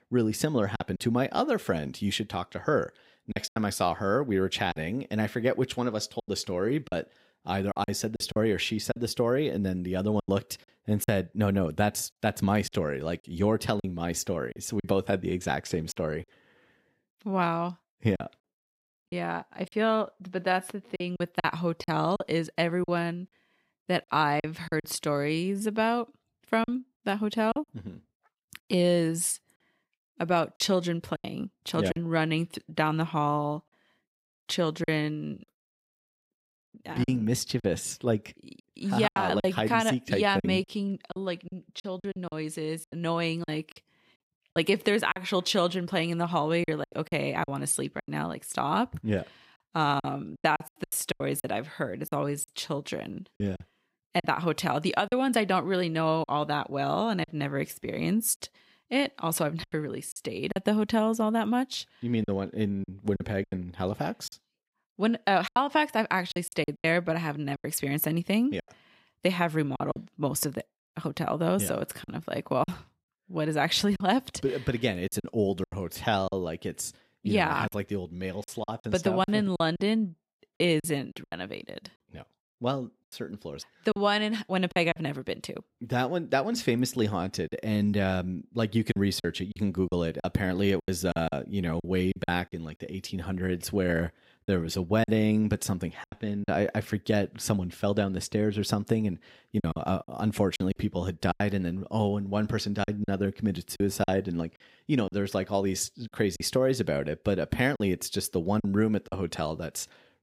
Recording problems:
choppy; very; 7% of the speech affected

